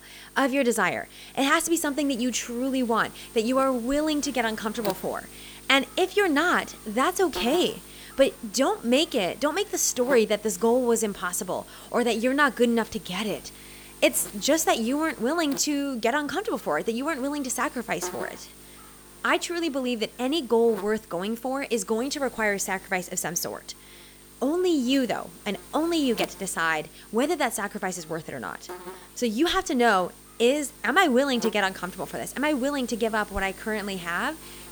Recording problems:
electrical hum; noticeable; throughout; 50 Hz, 20 dB below the speech

